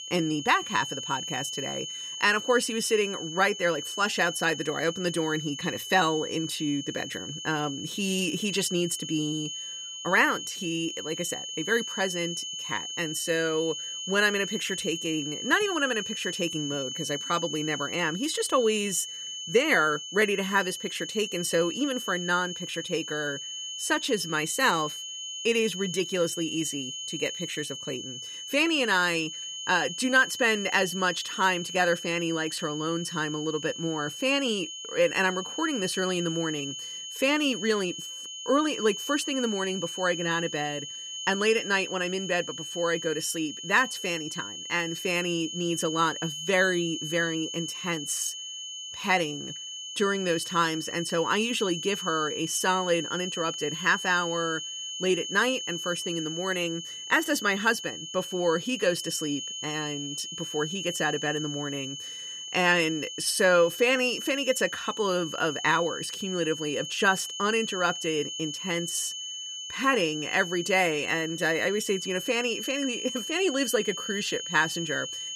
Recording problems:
high-pitched whine; loud; throughout; 3 kHz, 7 dB below the speech

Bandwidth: 14.5 kHz